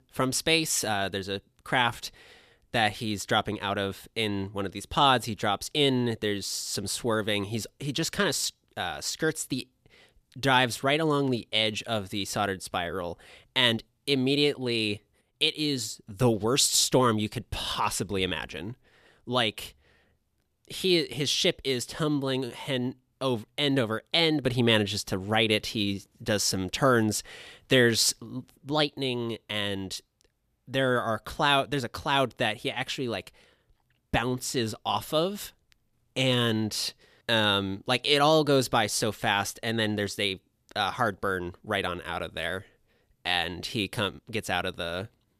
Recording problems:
none

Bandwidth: 14.5 kHz